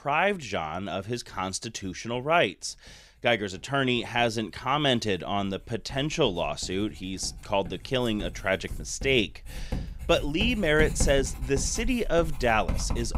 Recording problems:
household noises; noticeable; throughout; 10 dB below the speech

